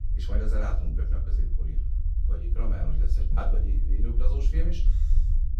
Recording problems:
off-mic speech; far
room echo; slight; dies away in 0.4 s
low rumble; loud; throughout; 8 dB below the speech

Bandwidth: 15 kHz